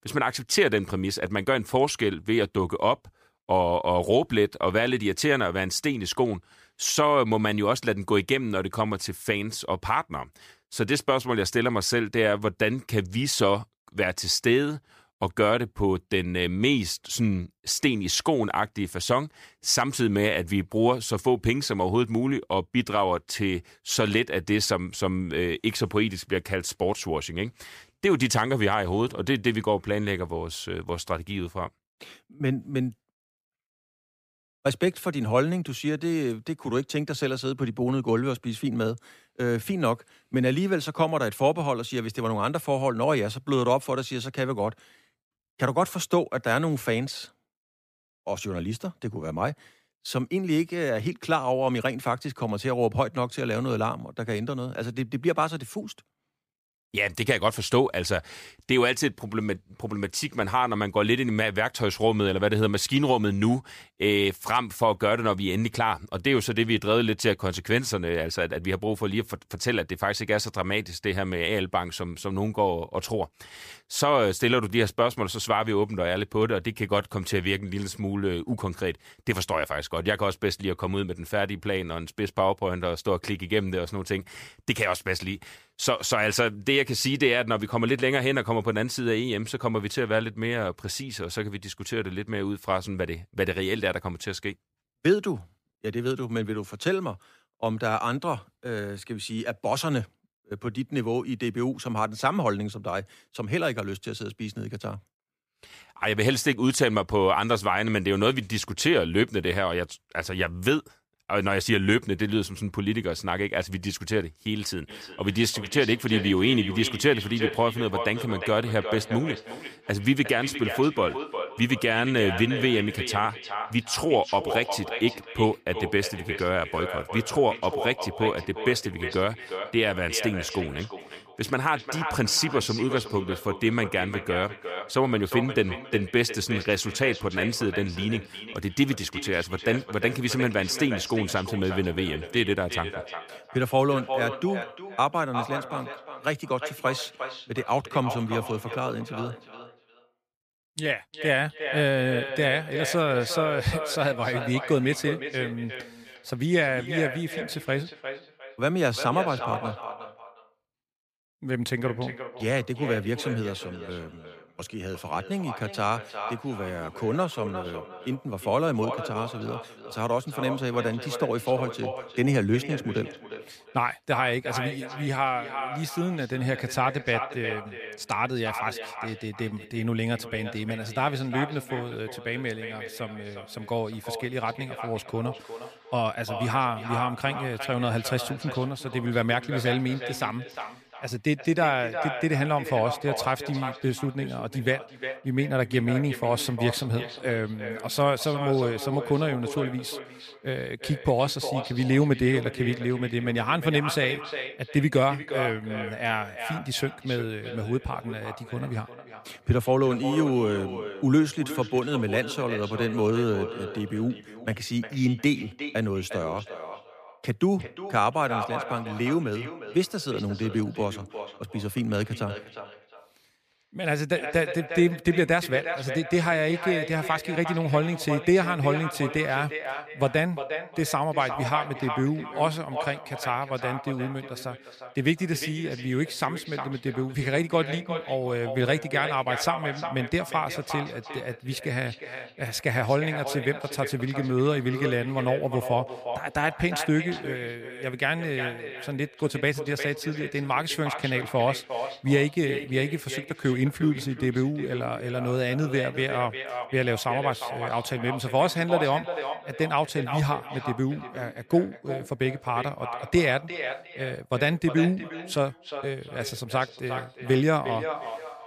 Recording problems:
echo of what is said; strong; from 1:55 on; 360 ms later, 9 dB below the speech

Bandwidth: 15 kHz